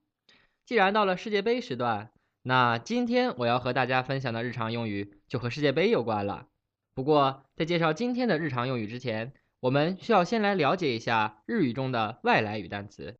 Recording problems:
none

